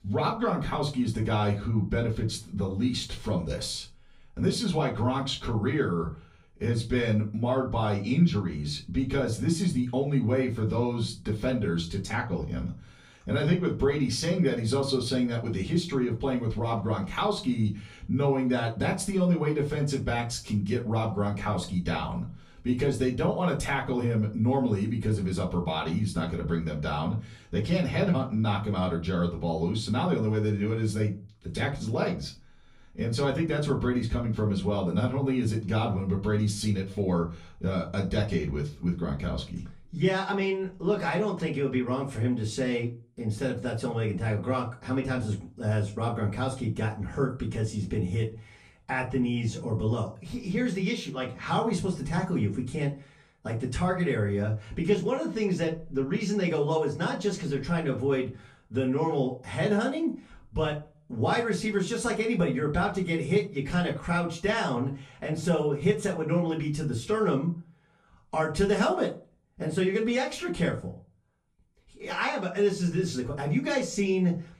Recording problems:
off-mic speech; far
room echo; slight; dies away in 0.3 s

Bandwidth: 15 kHz